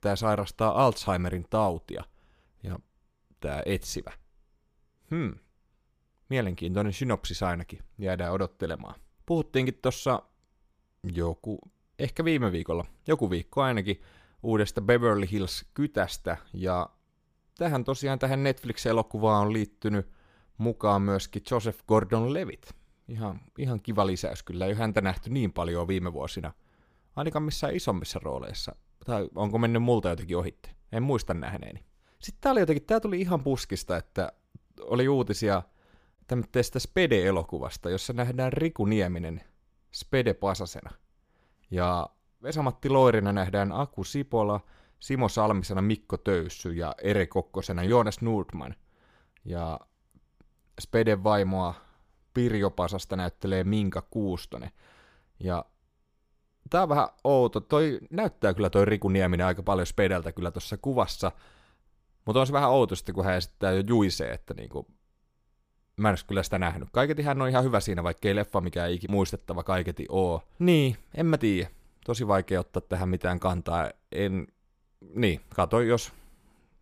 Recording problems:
none

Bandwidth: 15 kHz